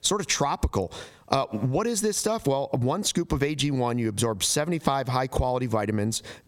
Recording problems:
squashed, flat; somewhat

